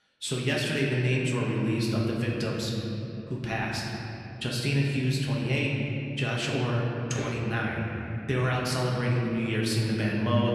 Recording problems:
off-mic speech; far
room echo; noticeable; dies away in 3 s

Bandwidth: 14.5 kHz